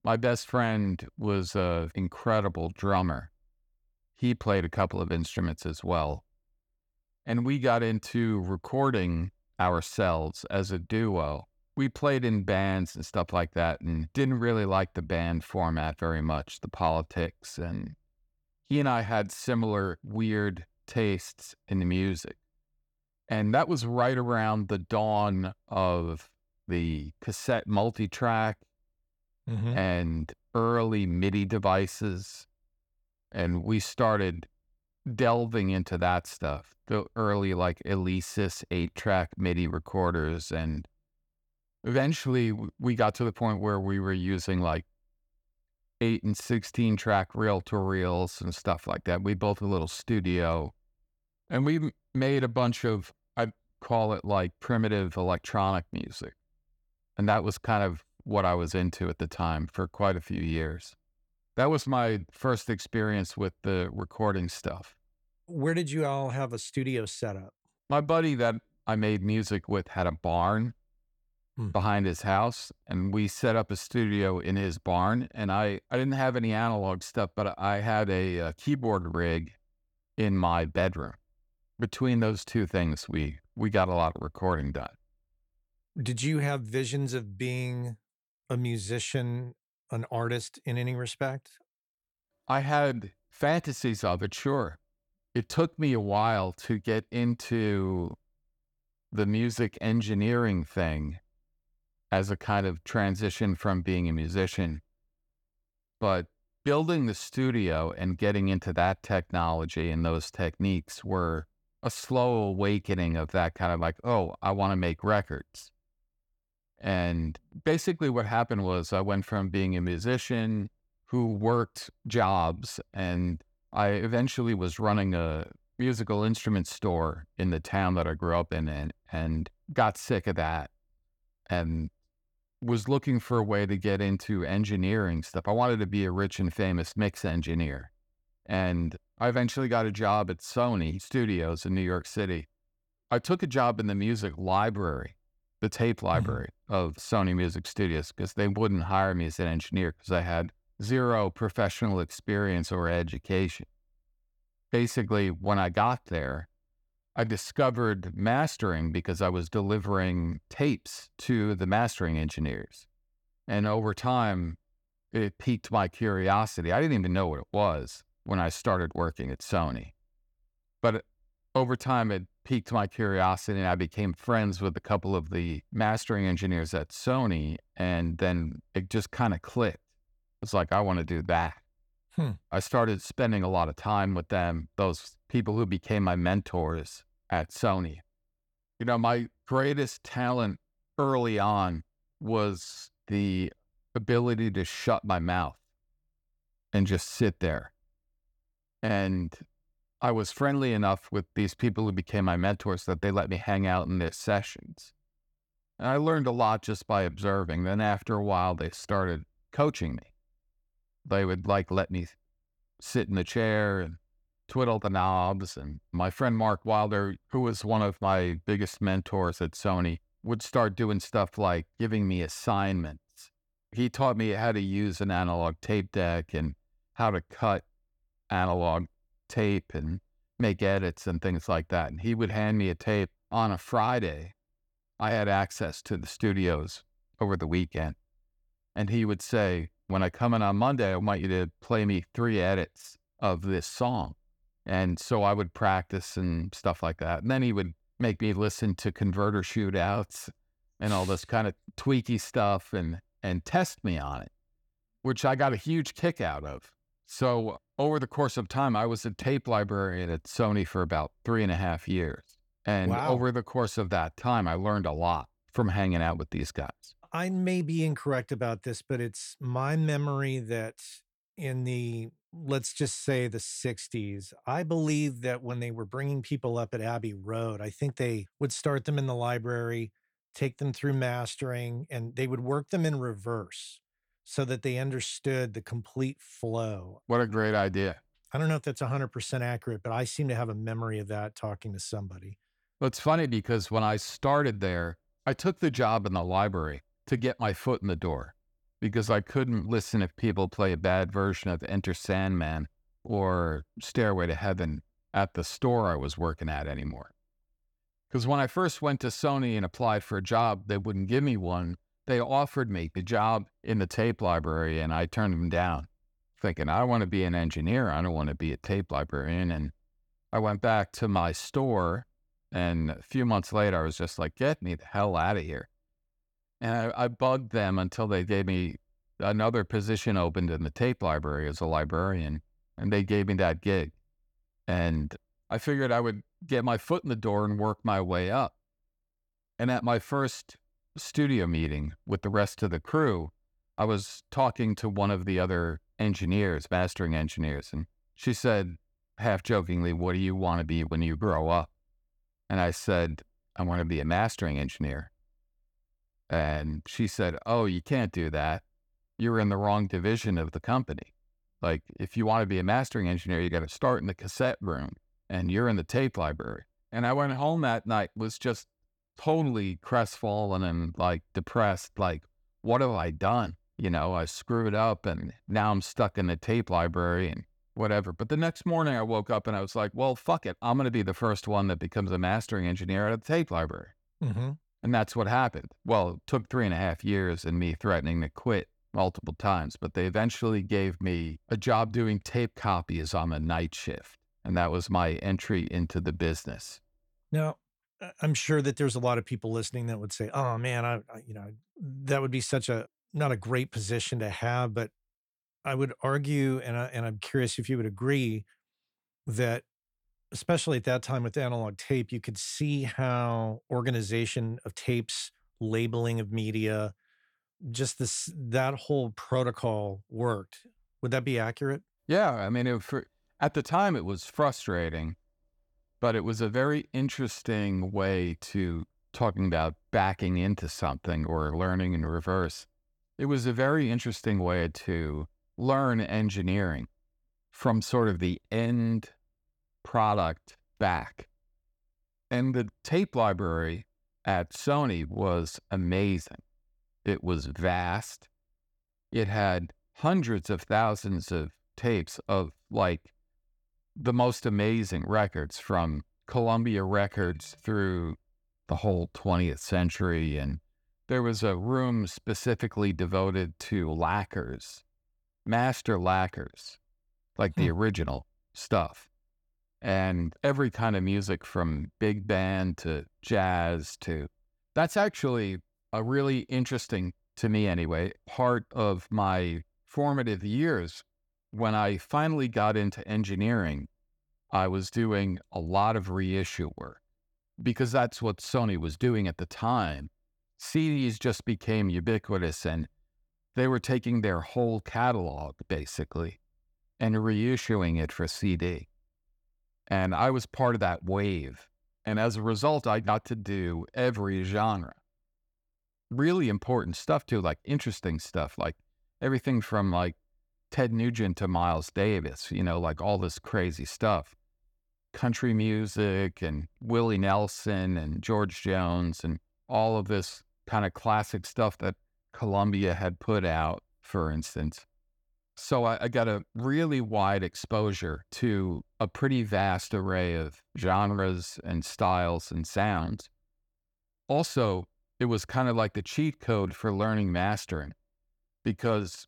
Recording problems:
none

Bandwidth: 18 kHz